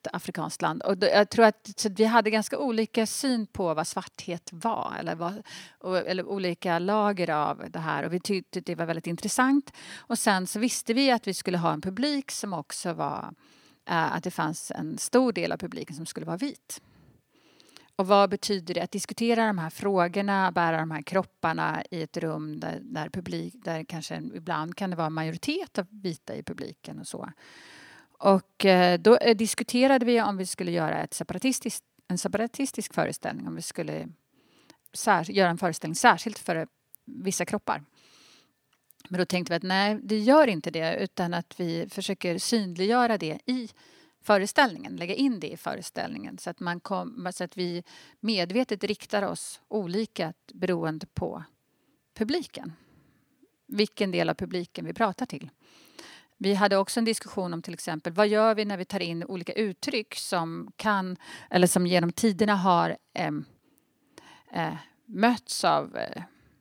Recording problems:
none

